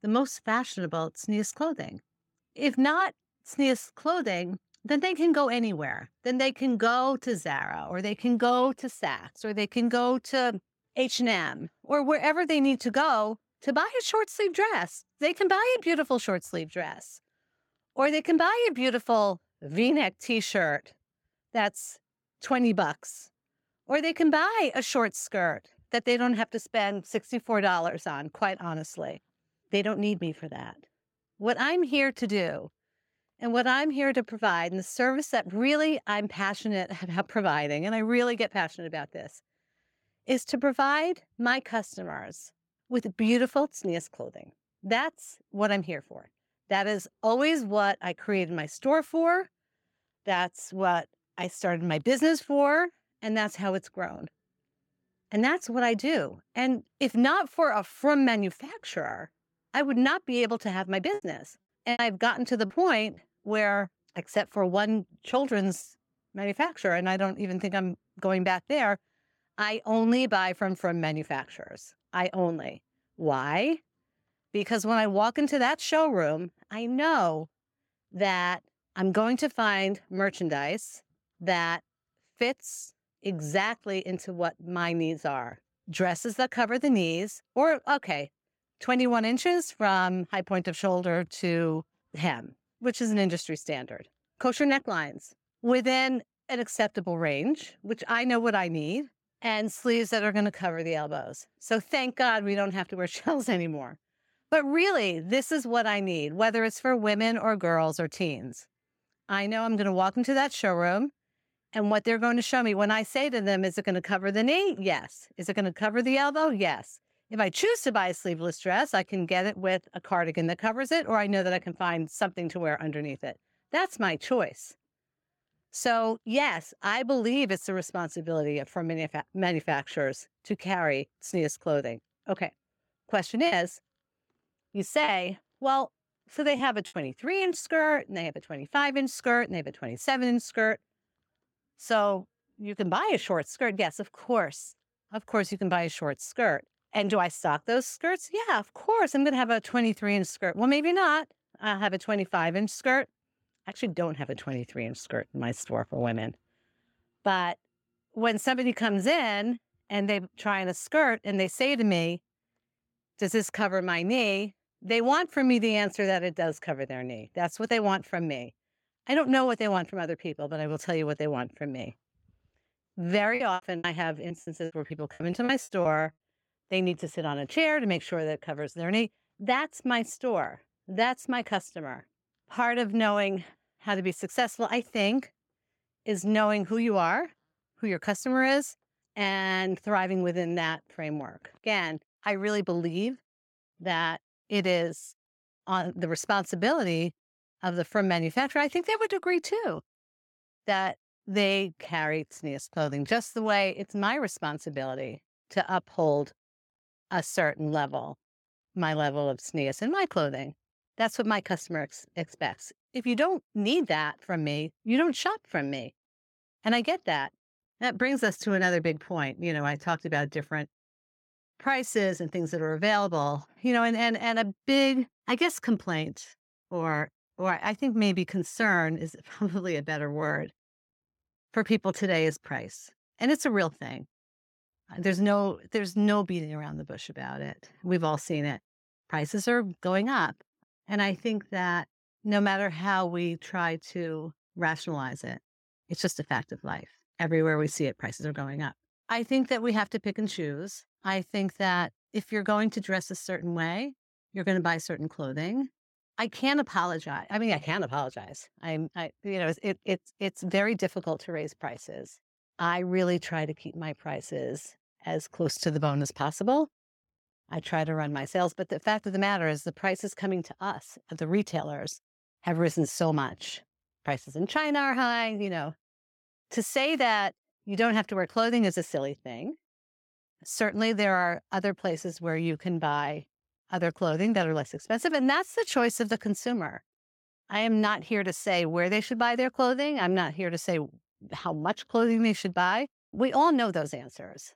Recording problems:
choppy; very; from 1:01 to 1:03, from 2:13 to 2:17 and from 2:53 to 2:56; 12% of the speech affected

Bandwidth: 17 kHz